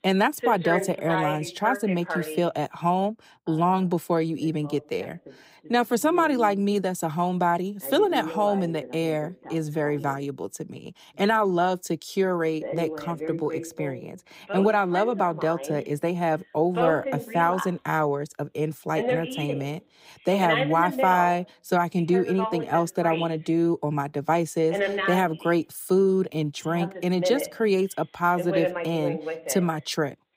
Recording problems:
voice in the background; loud; throughout; 7 dB below the speech

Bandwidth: 15.5 kHz